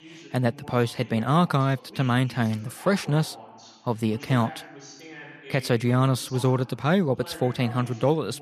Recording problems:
voice in the background; noticeable; throughout; 20 dB below the speech

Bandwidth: 14 kHz